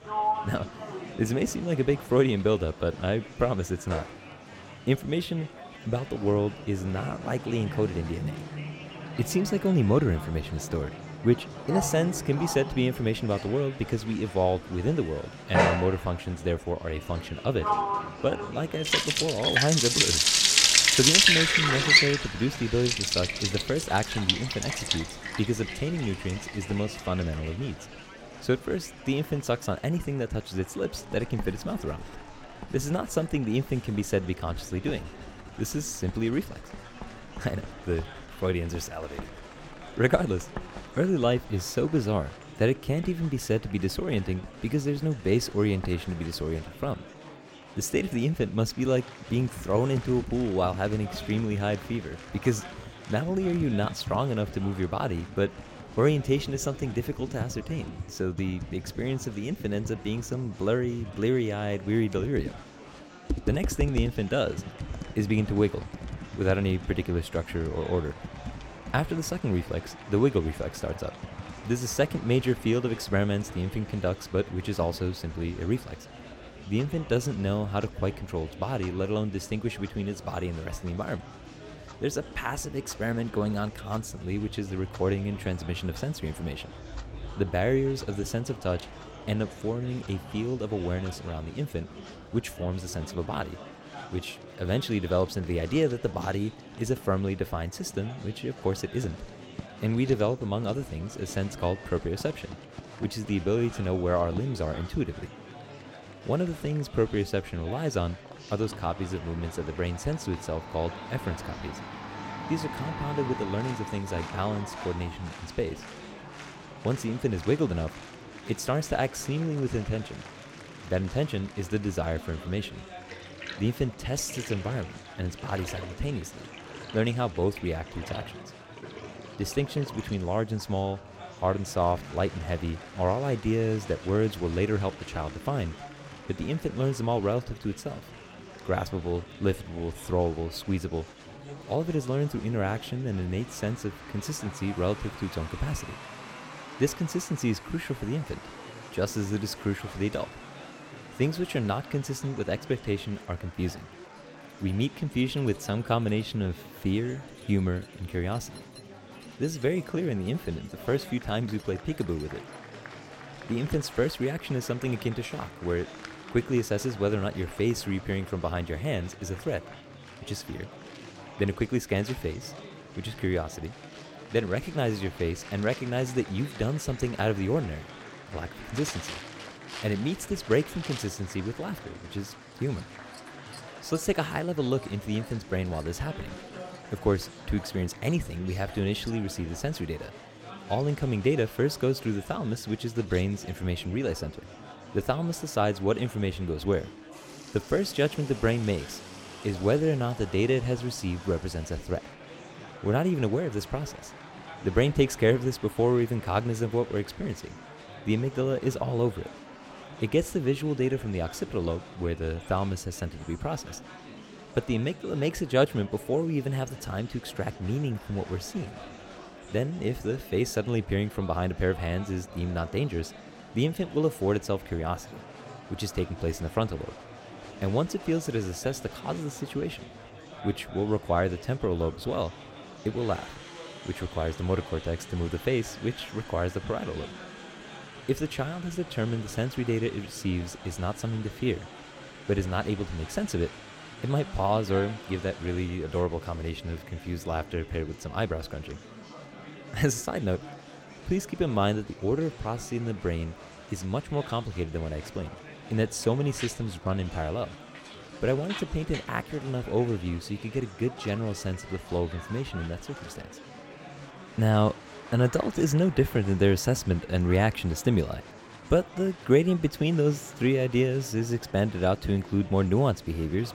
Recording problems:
household noises; loud; throughout; 1 dB below the speech
murmuring crowd; noticeable; throughout; 15 dB below the speech

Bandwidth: 16.5 kHz